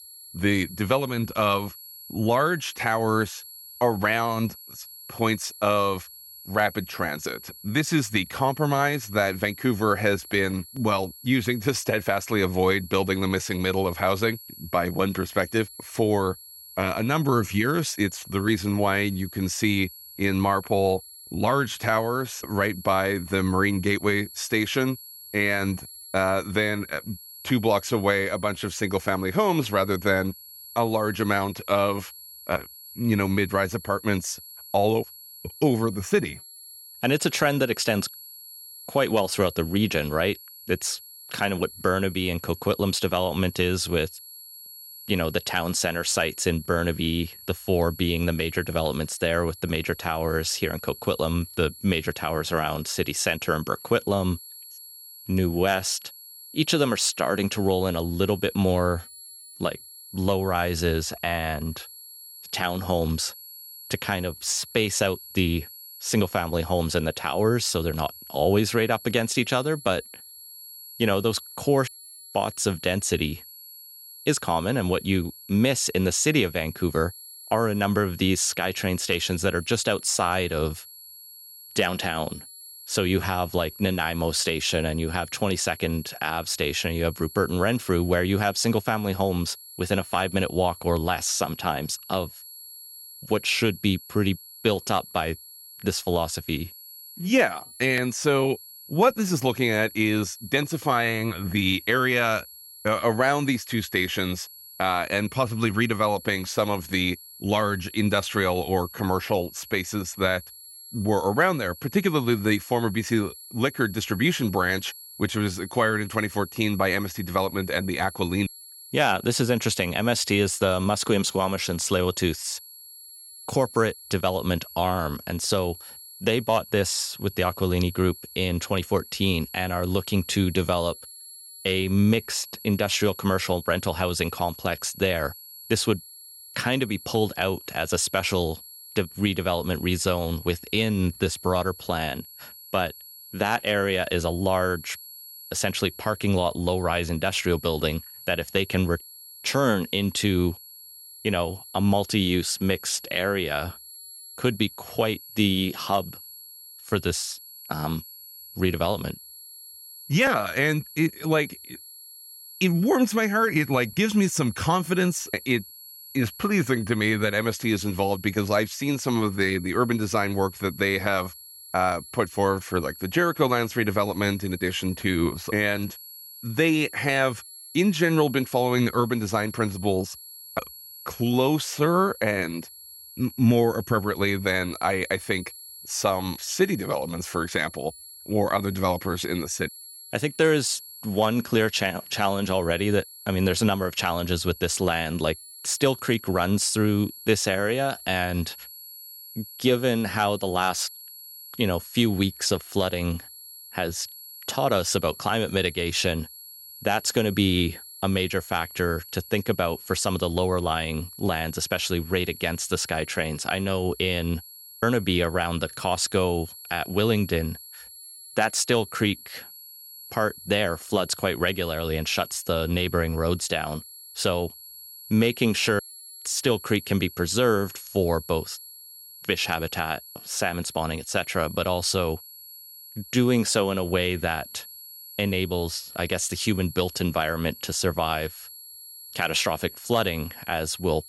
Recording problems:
high-pitched whine; noticeable; throughout; 11.5 kHz, 15 dB below the speech

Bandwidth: 16 kHz